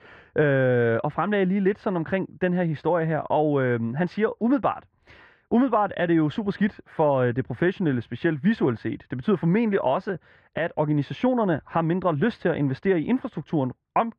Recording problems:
muffled; very; fading above 4 kHz

